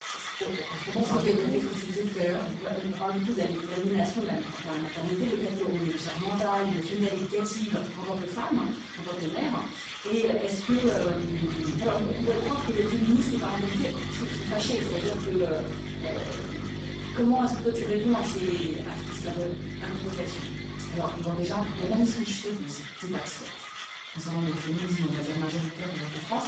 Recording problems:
off-mic speech; far
garbled, watery; badly; nothing above 7.5 kHz
room echo; noticeable; dies away in 0.6 s
machinery noise; loud; throughout; 9 dB below the speech
electrical hum; noticeable; from 11 to 22 s; 50 Hz, 15 dB below the speech

